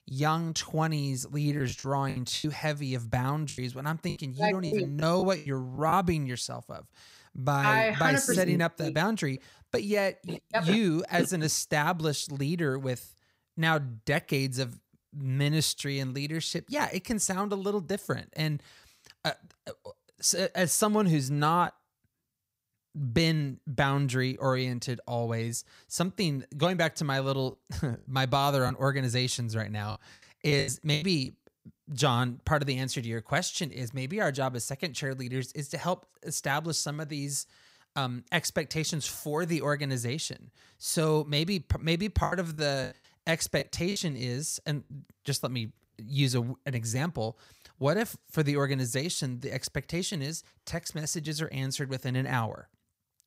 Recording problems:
choppy; very; from 1.5 to 6 s, from 29 to 31 s and from 42 to 45 s; 11% of the speech affected

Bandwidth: 15.5 kHz